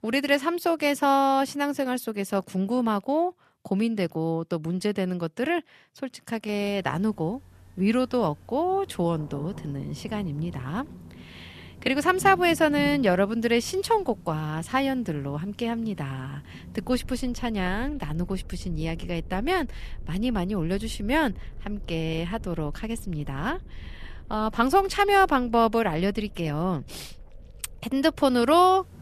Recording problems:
rain or running water; noticeable; from 6.5 s on; 20 dB below the speech

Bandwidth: 14 kHz